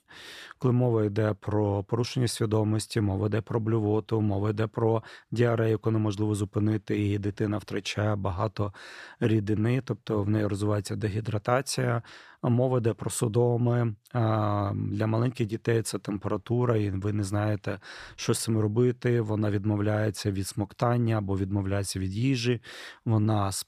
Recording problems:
none

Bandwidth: 14.5 kHz